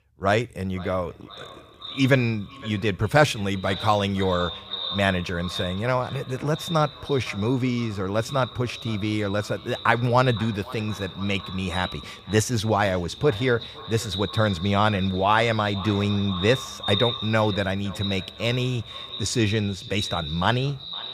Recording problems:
echo of what is said; strong; throughout; 510 ms later, 10 dB below the speech

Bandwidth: 15 kHz